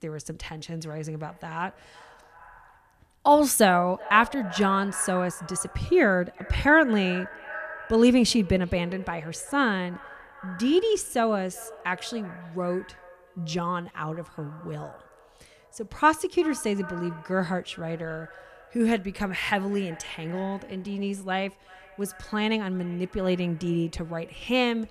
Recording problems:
echo of what is said; noticeable; throughout; 380 ms later, 20 dB below the speech

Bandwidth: 14.5 kHz